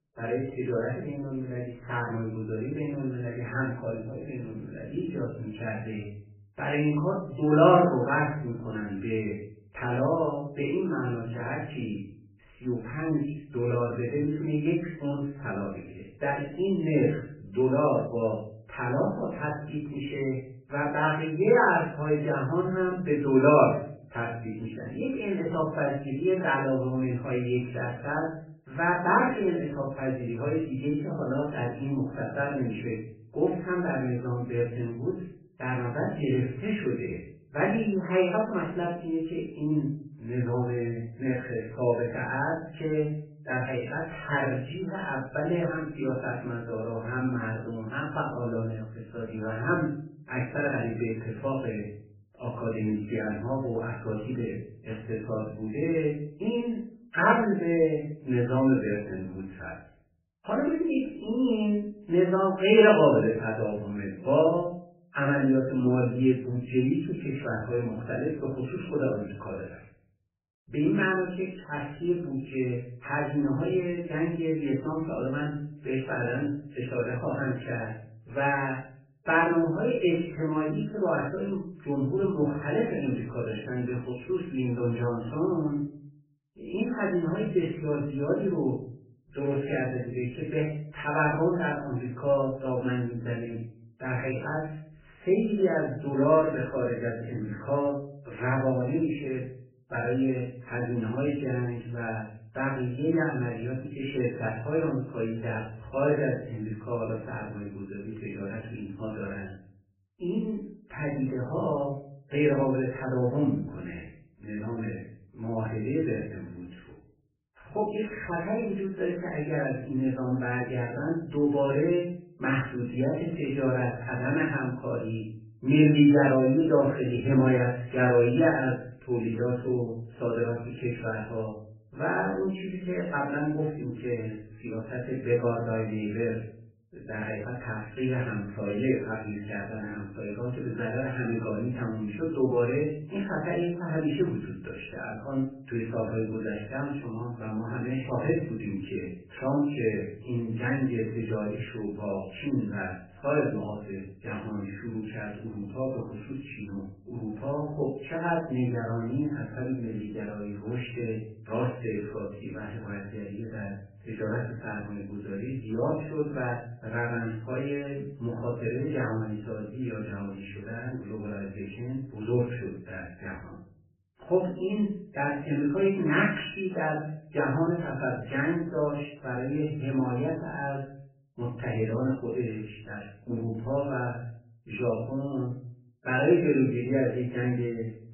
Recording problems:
off-mic speech; far
garbled, watery; badly; nothing above 3 kHz
room echo; noticeable; dies away in 0.5 s

